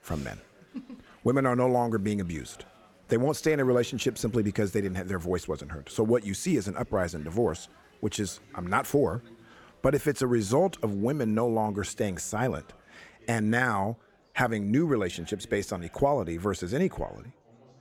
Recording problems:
chatter from many people; faint; throughout; 25 dB below the speech

